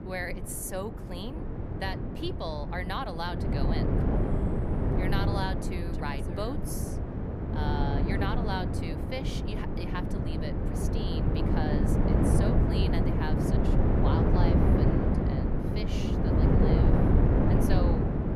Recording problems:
wind noise on the microphone; heavy; 3 dB above the speech

